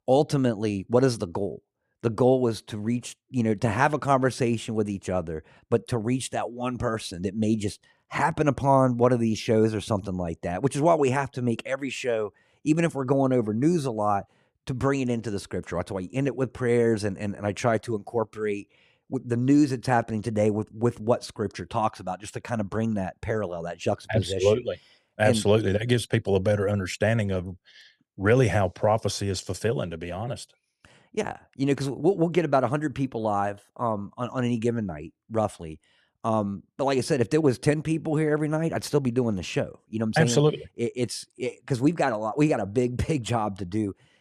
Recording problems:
none

